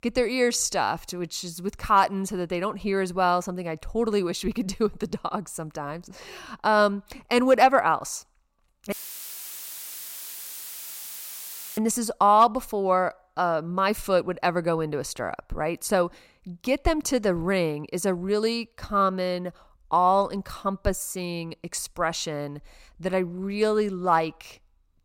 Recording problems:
audio cutting out; filled with static; at 9 s for 3 s

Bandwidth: 16.5 kHz